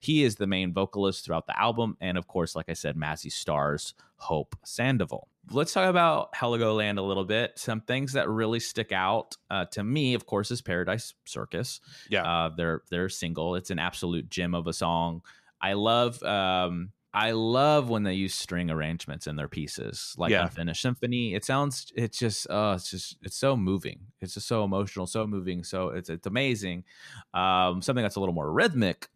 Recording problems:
none

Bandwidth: 14 kHz